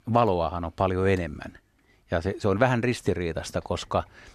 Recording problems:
none

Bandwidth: 13.5 kHz